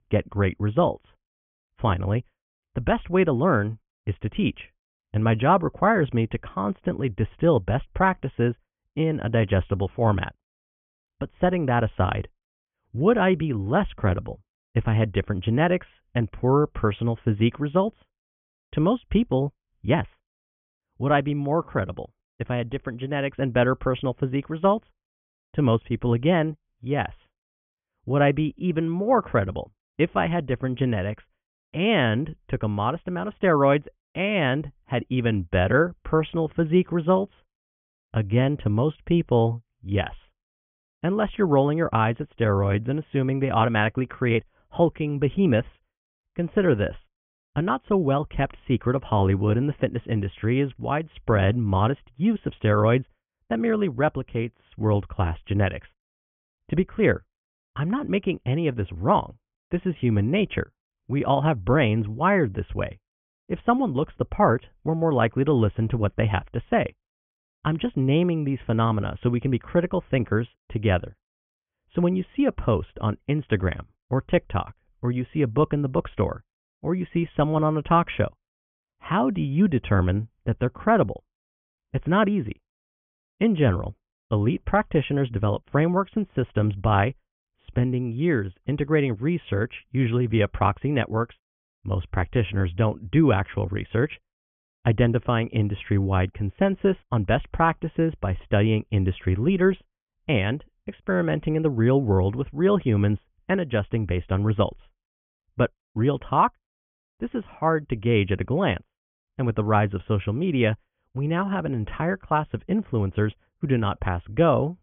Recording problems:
high frequencies cut off; severe; nothing above 3.5 kHz

